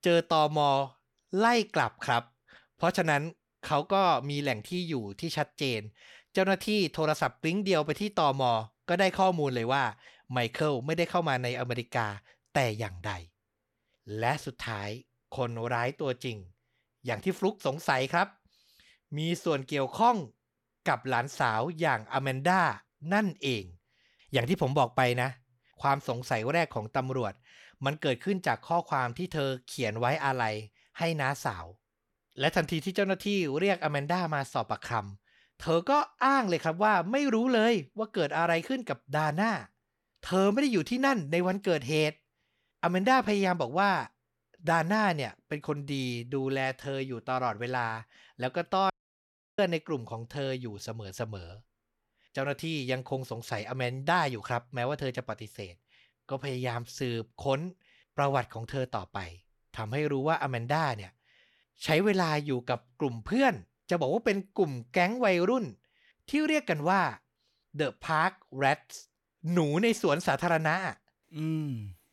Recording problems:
audio cutting out; at 49 s for 0.5 s

